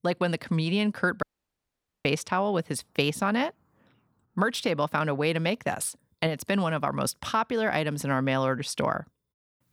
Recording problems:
audio cutting out; at 1 s for 1 s

